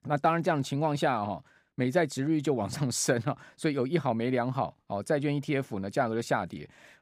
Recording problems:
none

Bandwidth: 15.5 kHz